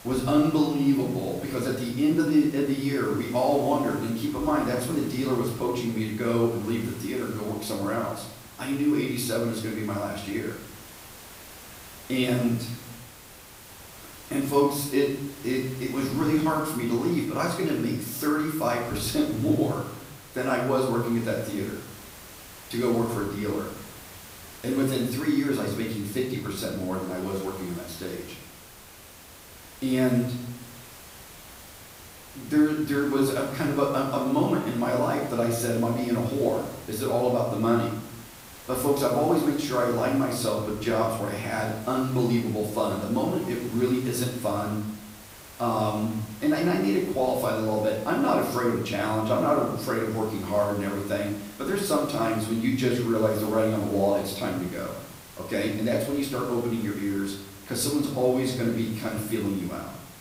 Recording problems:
off-mic speech; far
room echo; noticeable; dies away in 0.7 s
hiss; noticeable; throughout; 20 dB below the speech

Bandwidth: 15.5 kHz